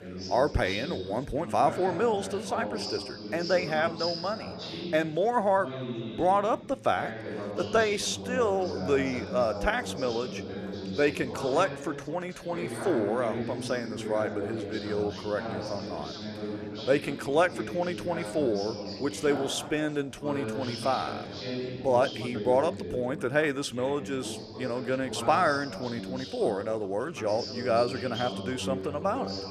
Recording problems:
background chatter; loud; throughout; 3 voices, 7 dB below the speech

